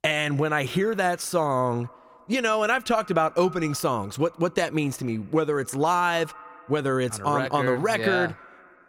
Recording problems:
echo of what is said; faint; throughout; 90 ms later, 25 dB below the speech

